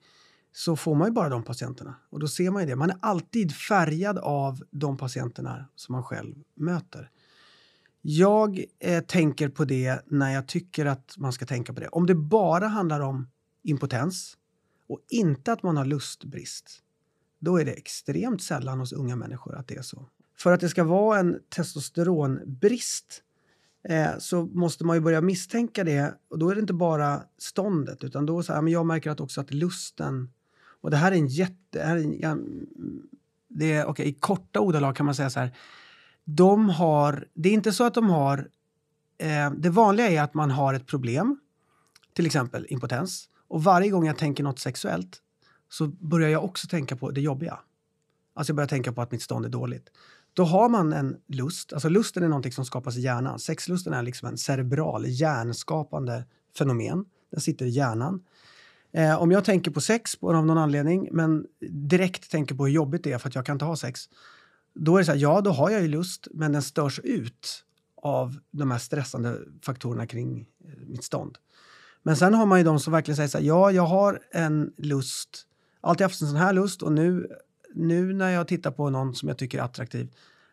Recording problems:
none

